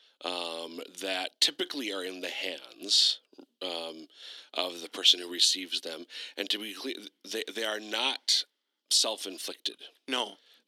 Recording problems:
thin; somewhat; fading below 300 Hz

